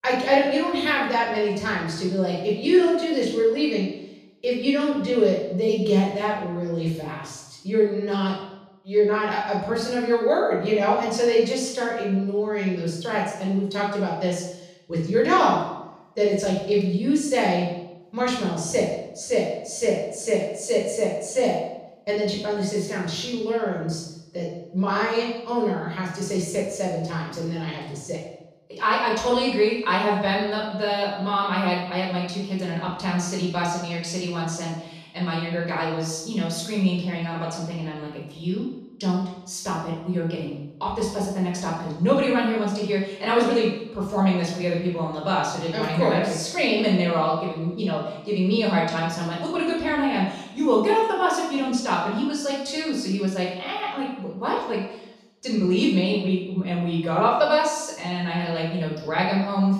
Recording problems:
off-mic speech; far
room echo; noticeable; dies away in 0.8 s

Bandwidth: 14.5 kHz